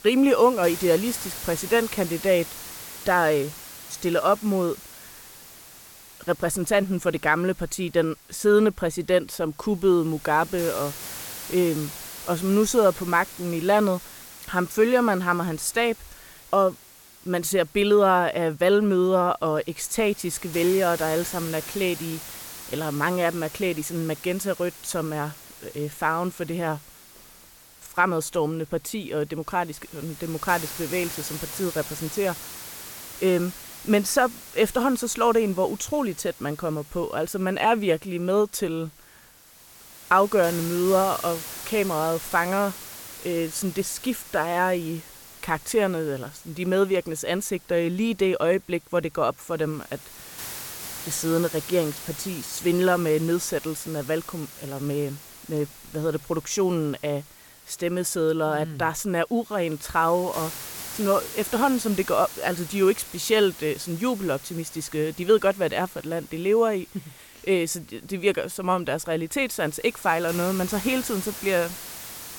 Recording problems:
hiss; noticeable; throughout; 15 dB below the speech

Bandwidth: 17 kHz